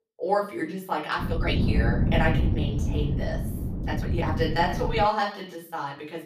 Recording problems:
off-mic speech; far
room echo; slight; dies away in 0.4 s
wind noise on the microphone; heavy; from 1 to 5 s; 9 dB below the speech
uneven, jittery; strongly; from 1.5 to 5.5 s

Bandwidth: 15 kHz